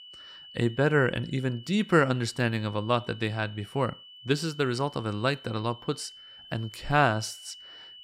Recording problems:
high-pitched whine; noticeable; throughout; 3 kHz, 20 dB below the speech

